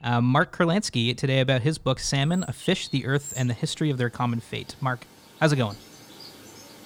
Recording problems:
animal sounds; noticeable; throughout; 20 dB below the speech

